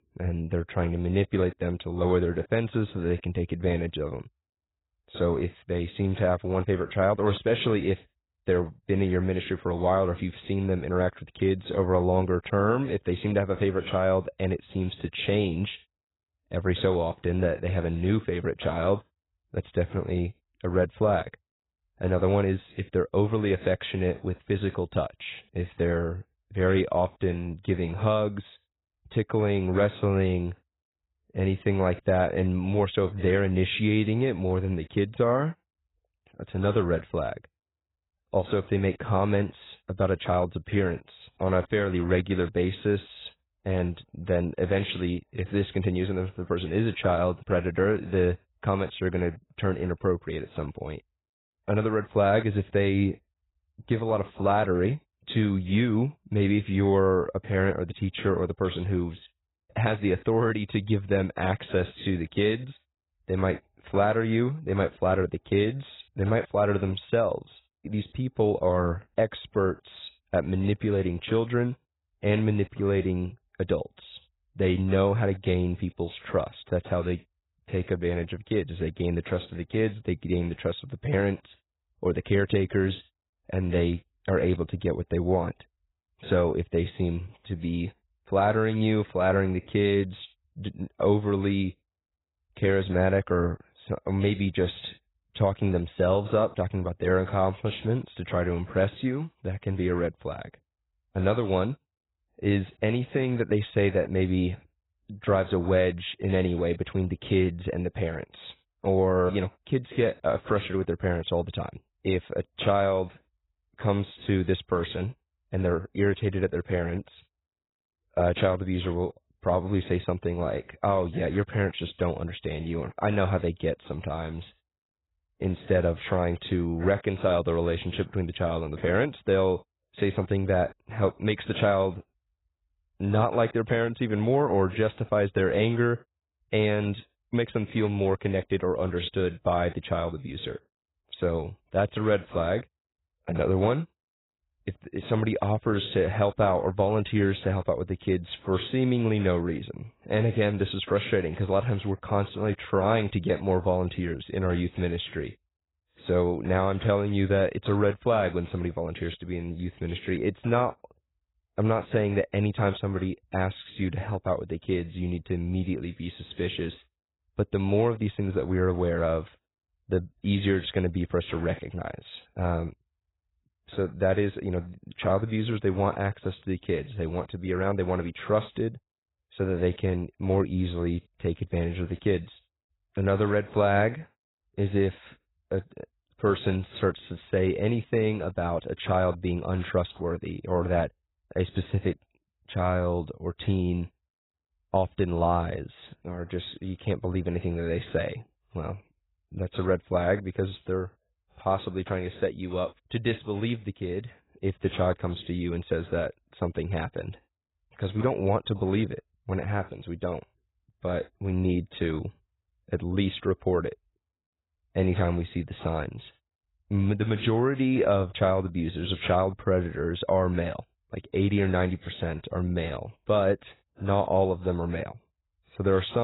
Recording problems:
garbled, watery; badly; nothing above 4 kHz
abrupt cut into speech; at the end

